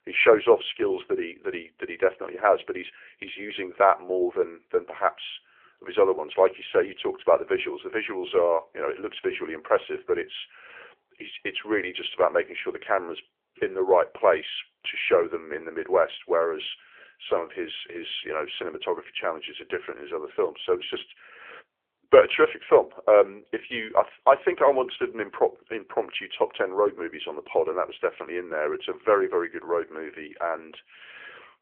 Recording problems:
phone-call audio; nothing above 3.5 kHz

